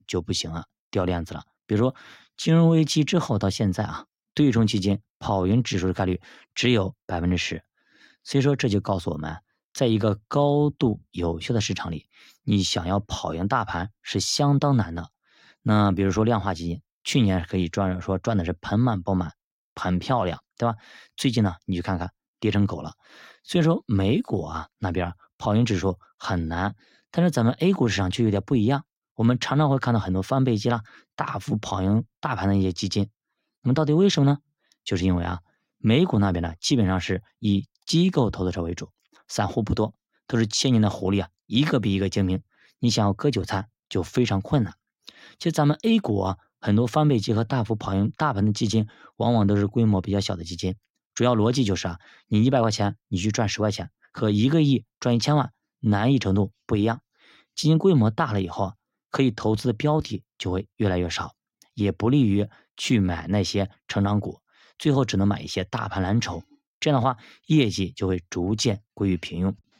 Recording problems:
none

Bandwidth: 16 kHz